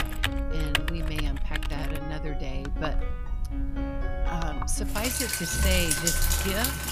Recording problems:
household noises; very loud; throughout; 3 dB above the speech
background music; loud; throughout; 6 dB below the speech

